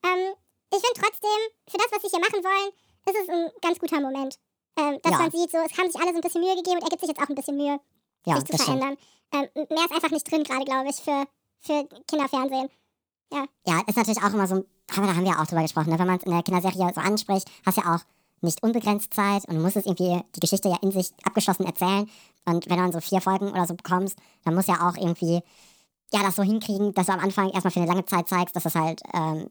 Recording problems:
wrong speed and pitch; too fast and too high; 1.6 times normal speed

